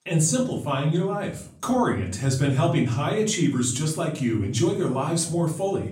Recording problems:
off-mic speech; far
room echo; slight; dies away in 0.4 s

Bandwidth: 16 kHz